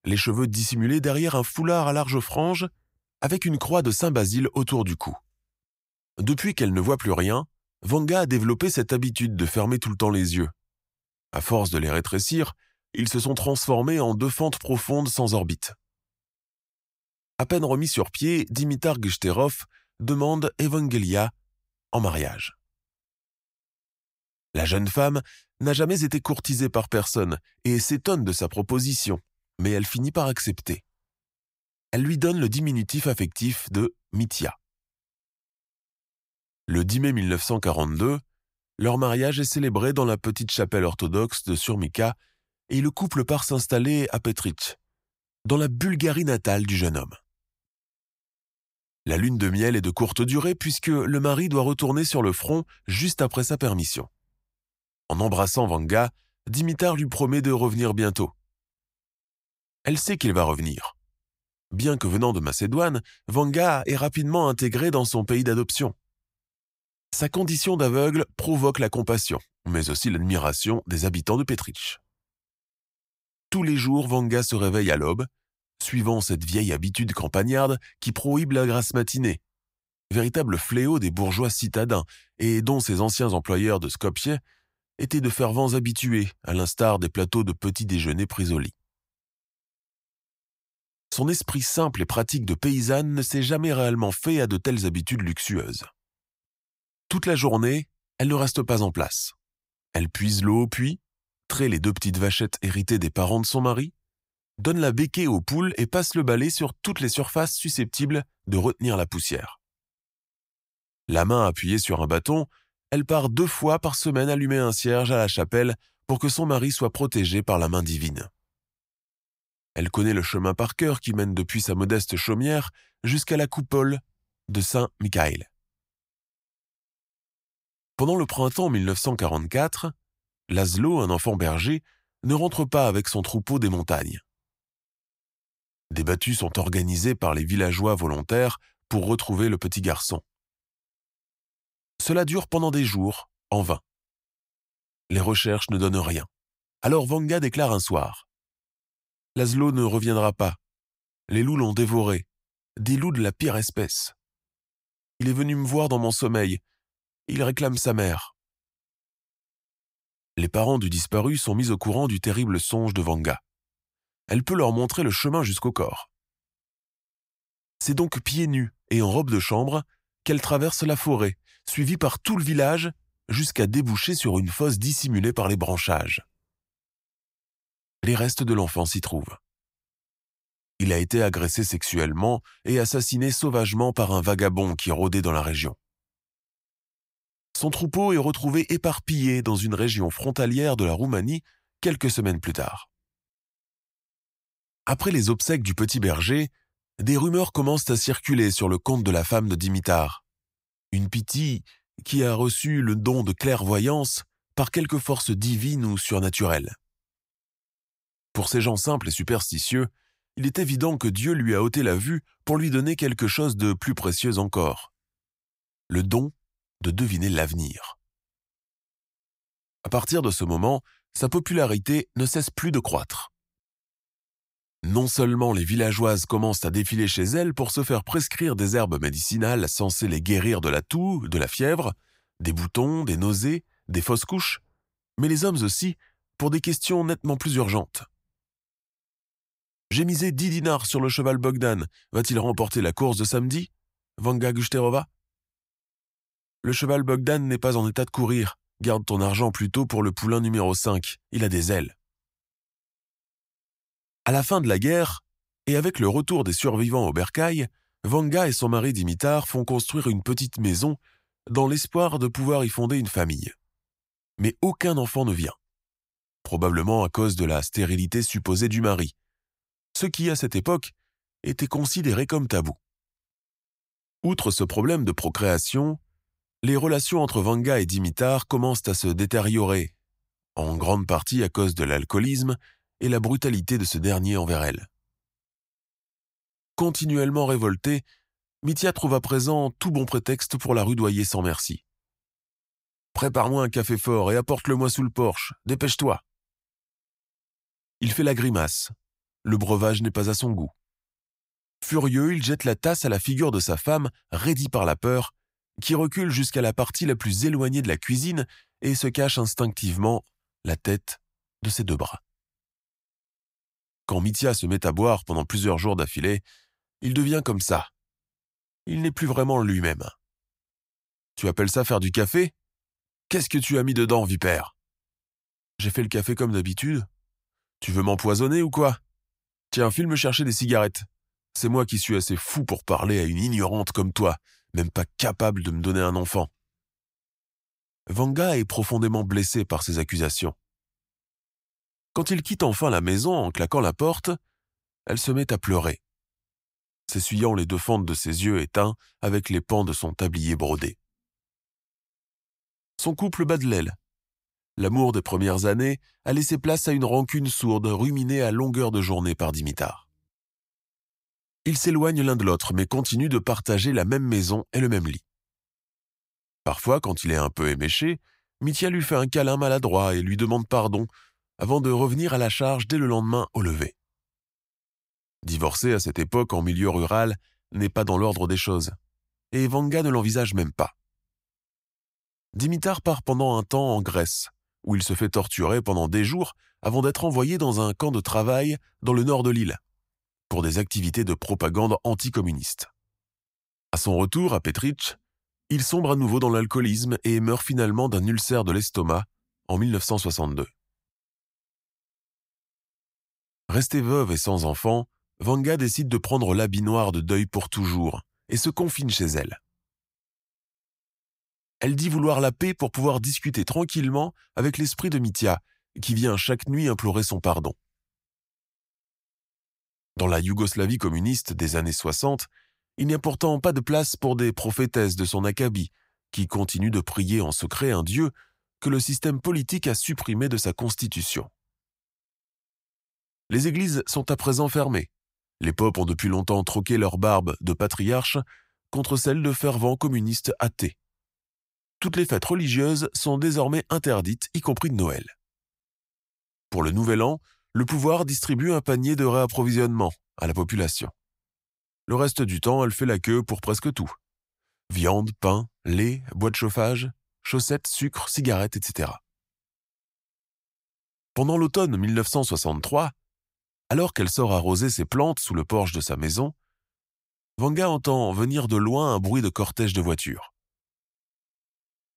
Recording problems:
none

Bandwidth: 15.5 kHz